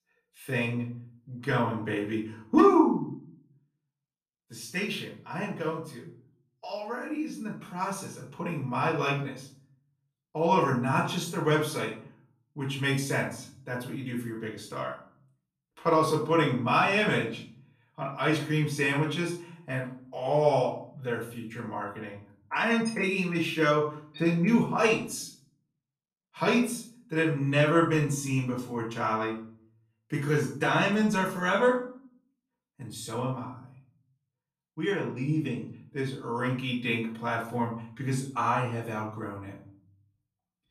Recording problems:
off-mic speech; far
room echo; noticeable; dies away in 0.5 s

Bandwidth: 14.5 kHz